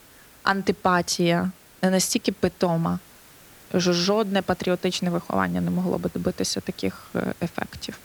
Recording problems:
hiss; faint; throughout; 25 dB below the speech

